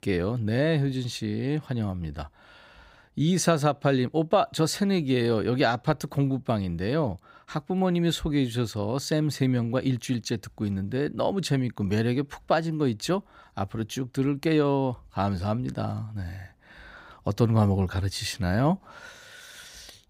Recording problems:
none

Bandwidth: 15.5 kHz